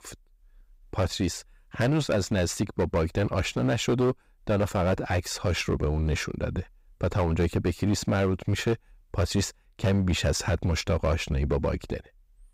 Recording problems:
distortion; slight; 8% of the sound clipped

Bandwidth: 15.5 kHz